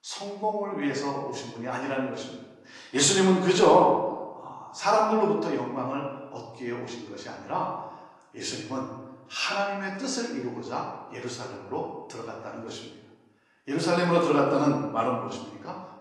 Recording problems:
off-mic speech; far
room echo; noticeable; dies away in 0.9 s
garbled, watery; slightly

